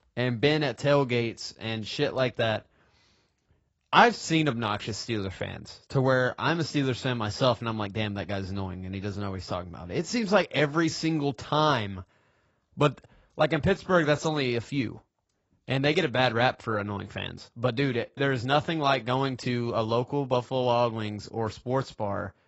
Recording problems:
garbled, watery; badly; nothing above 7.5 kHz

